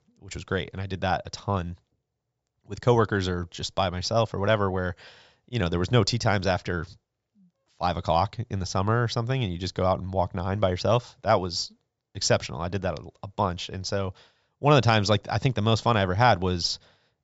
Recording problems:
high frequencies cut off; noticeable; nothing above 8 kHz

